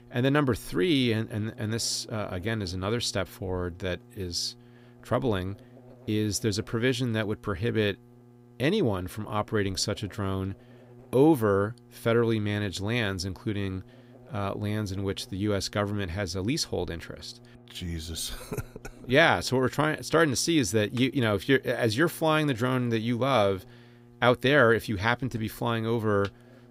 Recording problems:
electrical hum; faint; throughout; 60 Hz, 30 dB below the speech

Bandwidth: 15.5 kHz